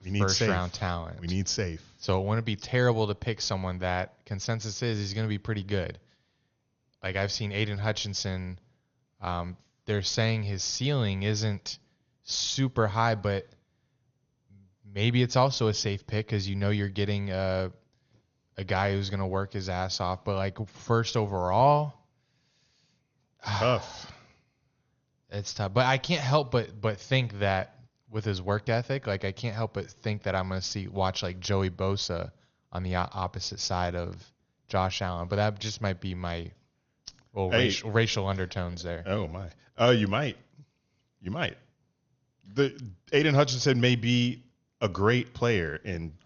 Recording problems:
garbled, watery; slightly; nothing above 6.5 kHz

